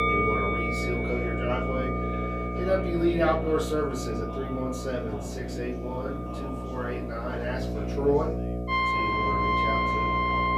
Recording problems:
off-mic speech; far
room echo; slight; dies away in 0.3 s
background music; very loud; throughout; 3 dB above the speech
electrical hum; loud; throughout; 60 Hz, 6 dB below the speech
background chatter; noticeable; throughout; 4 voices, 10 dB below the speech

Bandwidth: 14.5 kHz